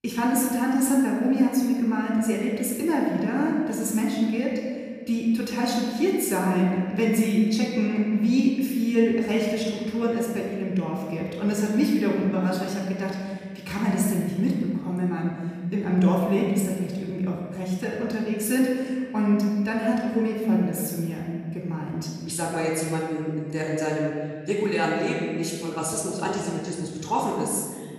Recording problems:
off-mic speech; far
room echo; noticeable; dies away in 1.9 s

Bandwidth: 14.5 kHz